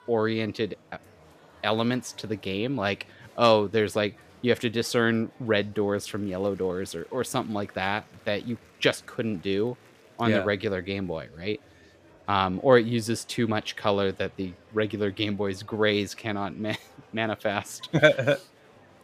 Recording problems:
murmuring crowd; faint; throughout; 25 dB below the speech

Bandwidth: 14.5 kHz